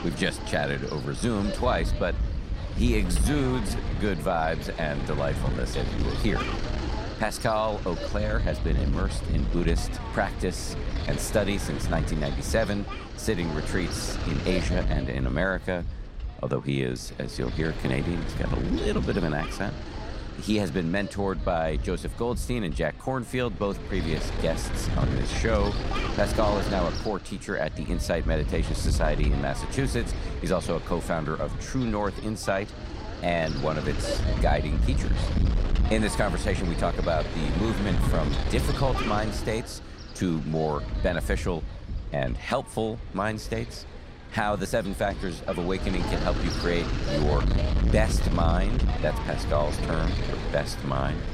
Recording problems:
wind noise on the microphone; heavy; 6 dB below the speech

